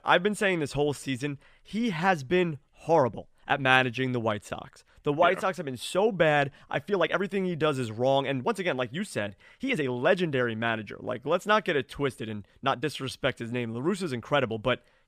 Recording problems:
uneven, jittery; strongly; from 1 to 14 s

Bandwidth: 15 kHz